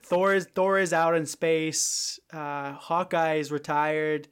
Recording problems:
none

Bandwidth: 16.5 kHz